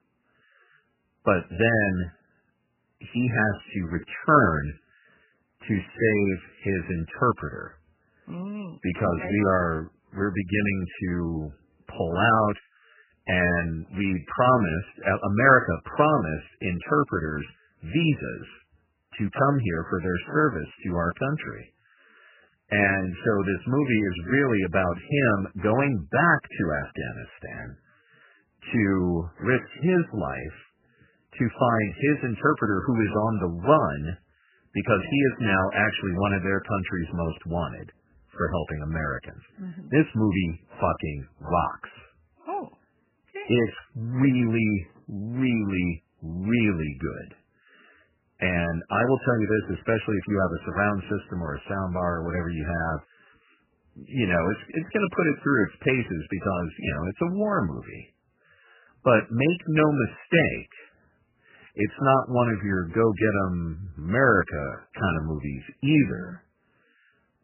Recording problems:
garbled, watery; badly; nothing above 3 kHz

